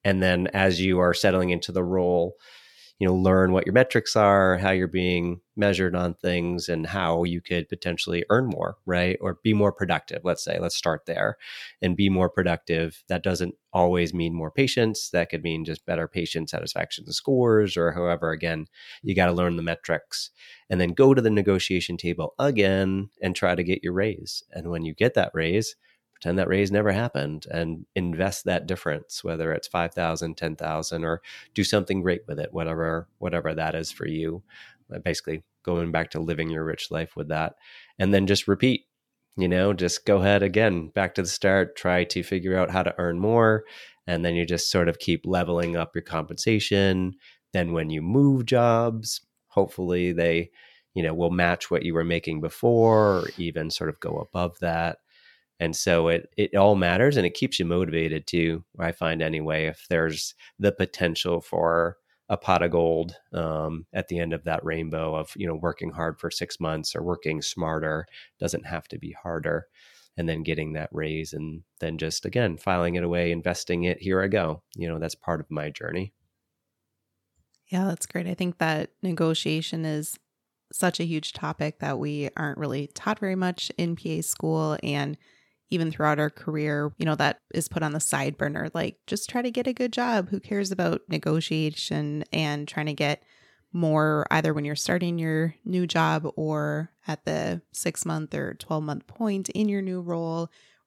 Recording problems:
none

